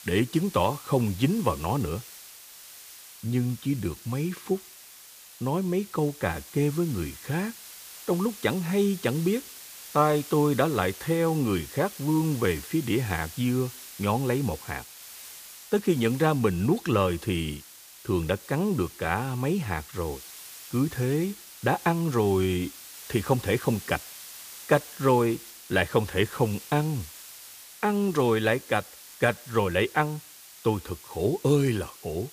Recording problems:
hiss; noticeable; throughout; 15 dB below the speech

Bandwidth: 15 kHz